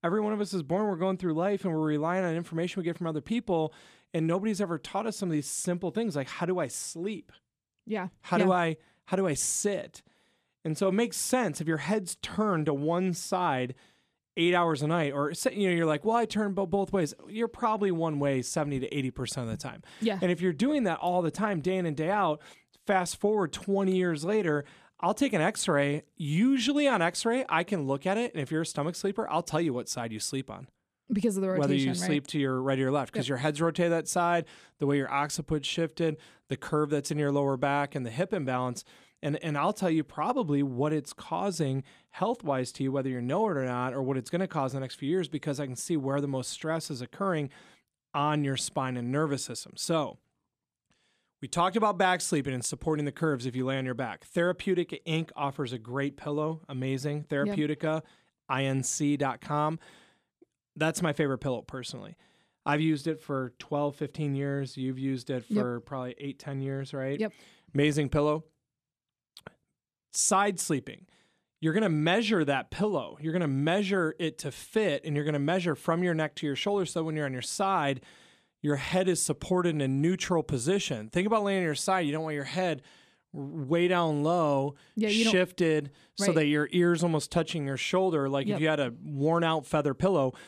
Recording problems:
none

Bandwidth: 14 kHz